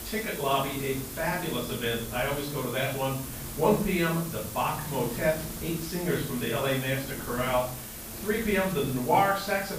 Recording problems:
off-mic speech; far
room echo; noticeable; dies away in 0.5 s
hiss; loud; throughout; 10 dB below the speech
wind noise on the microphone; occasional gusts; 20 dB below the speech

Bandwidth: 15 kHz